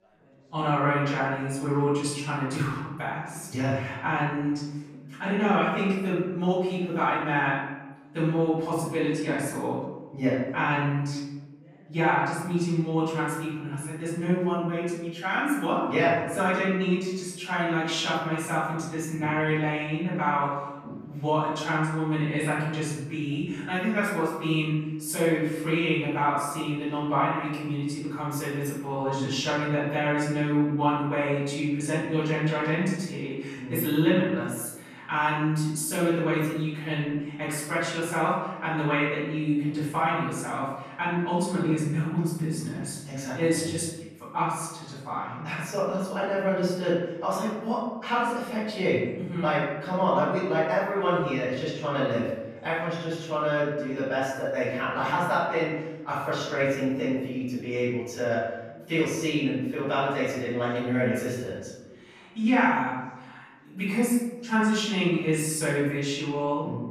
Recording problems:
off-mic speech; far
room echo; noticeable; dies away in 0.9 s
chatter from many people; faint; throughout; 25 dB below the speech

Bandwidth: 14 kHz